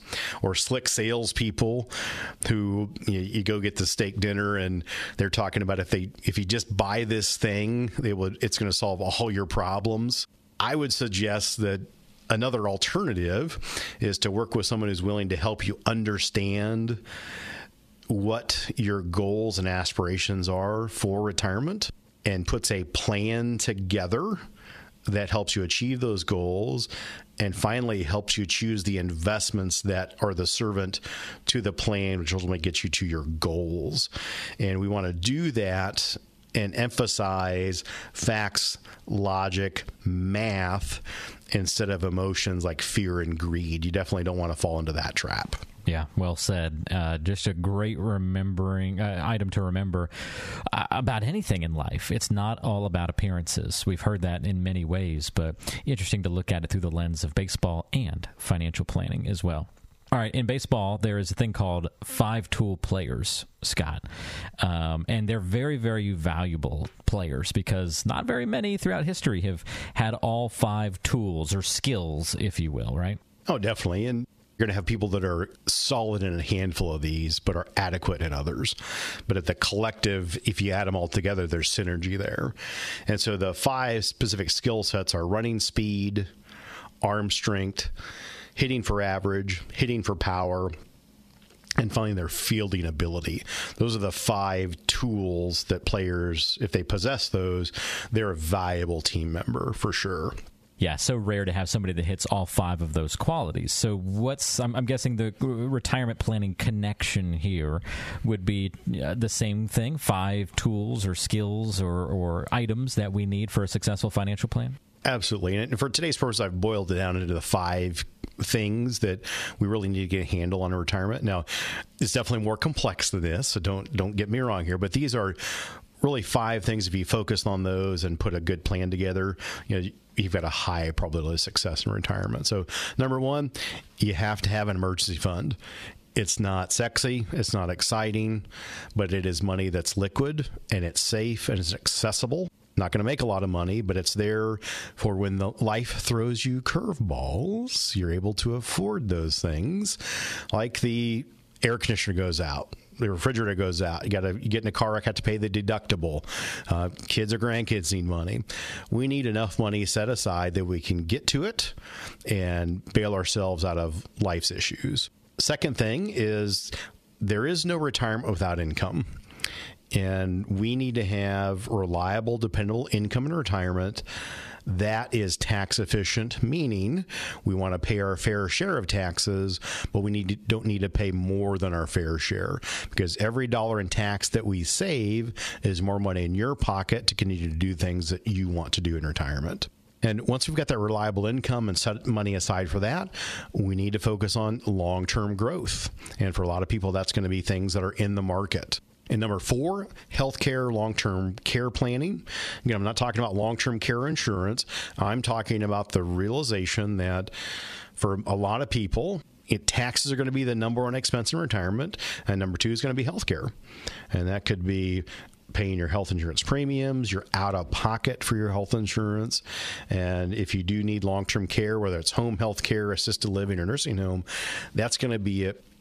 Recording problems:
squashed, flat; heavily

